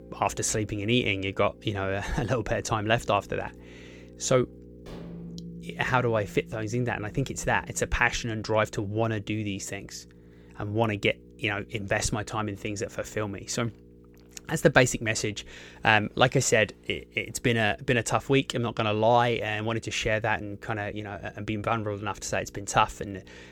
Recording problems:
electrical hum; faint; throughout; 60 Hz, 30 dB below the speech
background music; faint; until 13 s; 20 dB below the speech
clattering dishes; faint; at 5 s; peak 20 dB below the speech

